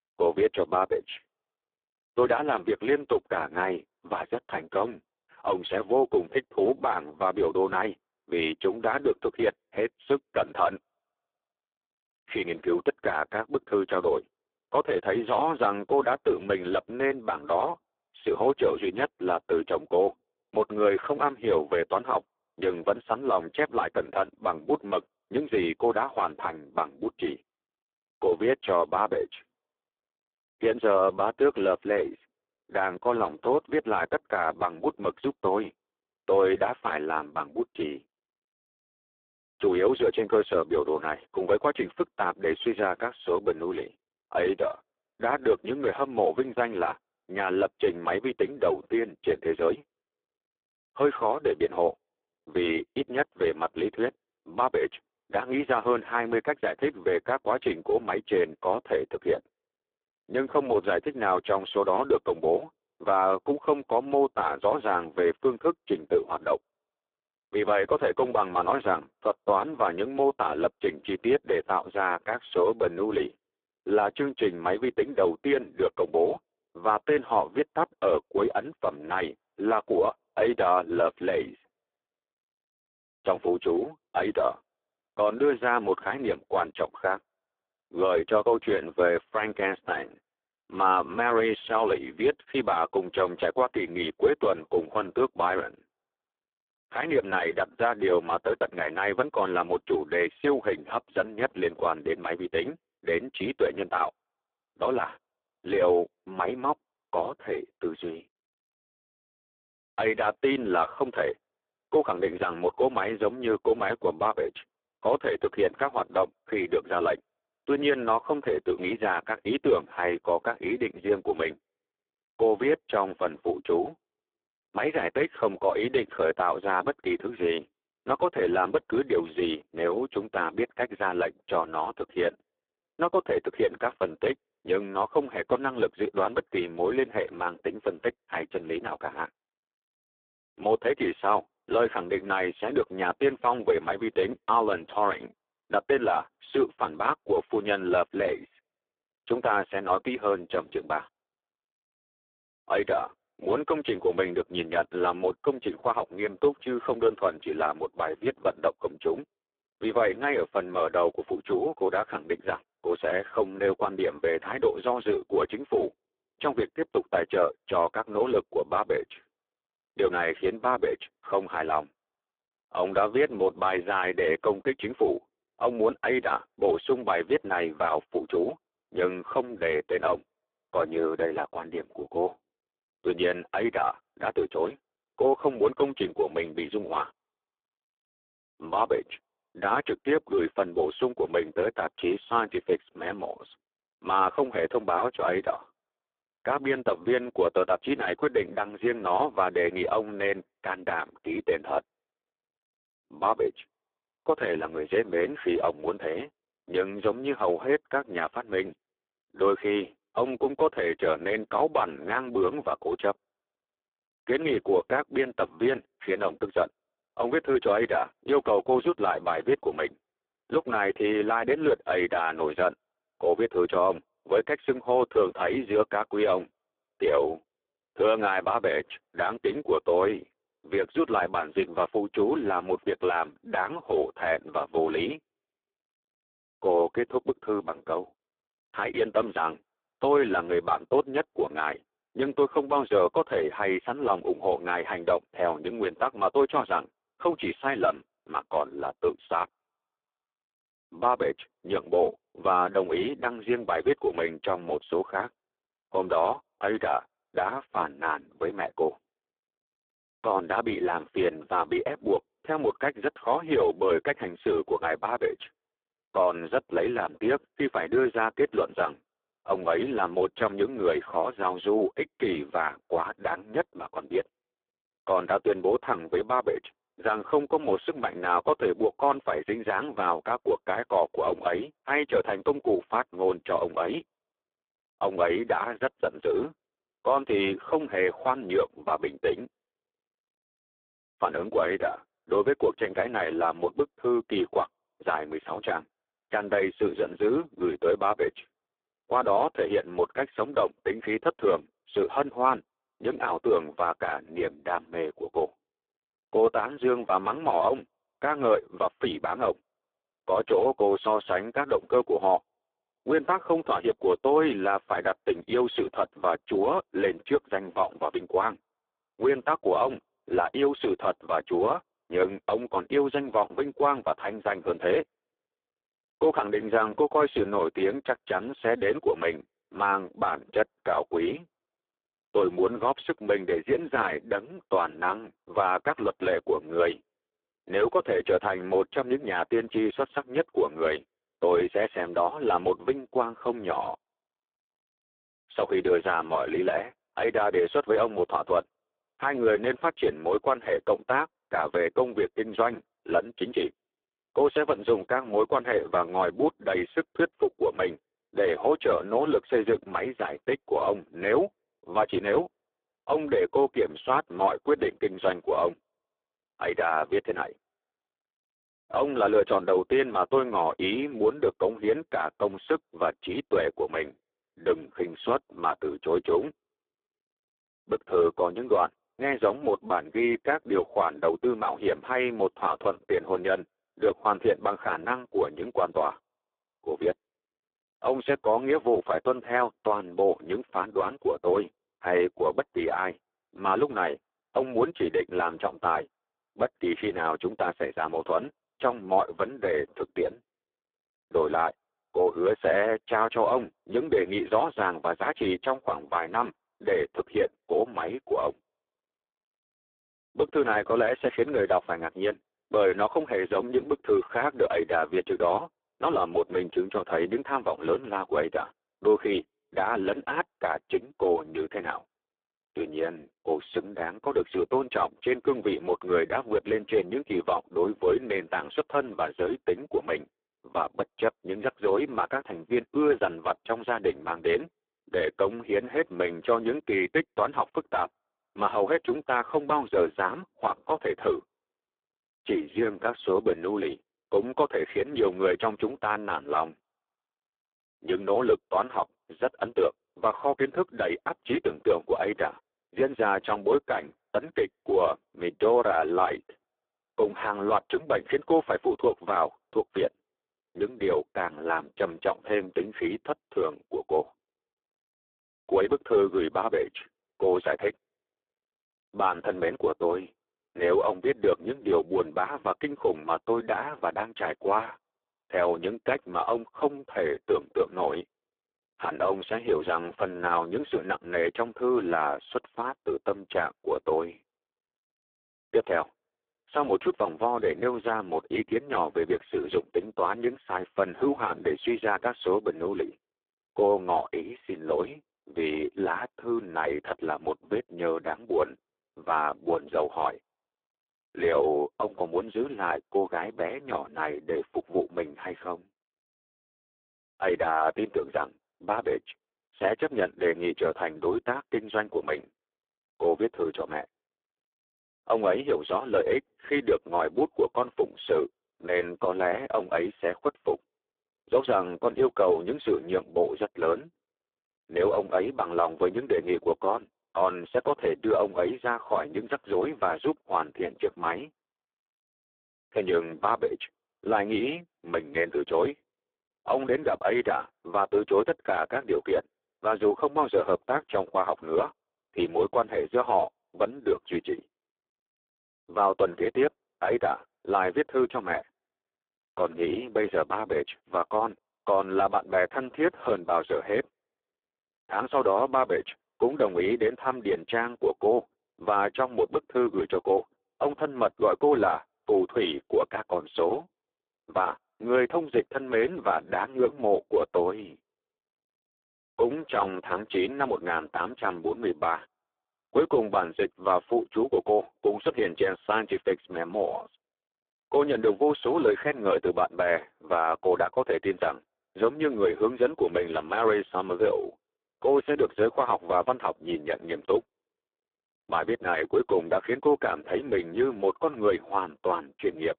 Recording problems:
phone-call audio; poor line

